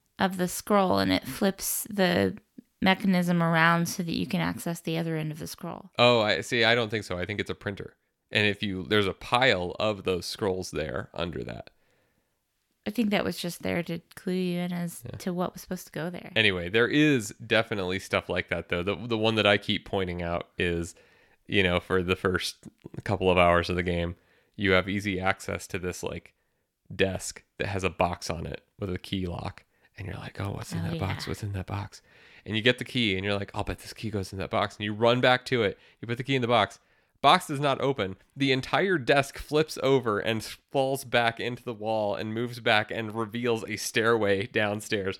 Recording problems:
none

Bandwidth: 17 kHz